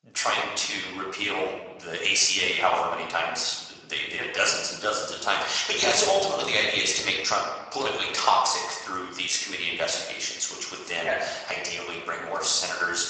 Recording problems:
garbled, watery; badly; nothing above 8 kHz
thin; very; fading below 650 Hz
room echo; noticeable; dies away in 1 s
off-mic speech; somewhat distant

